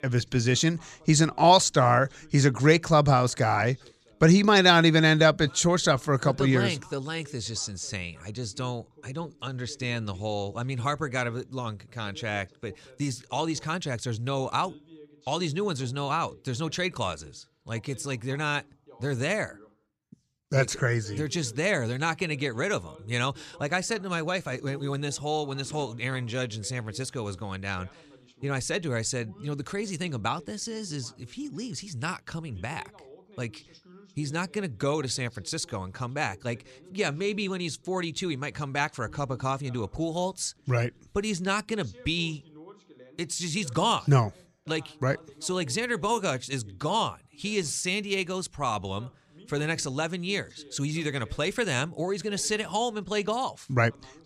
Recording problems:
voice in the background; faint; throughout; 25 dB below the speech

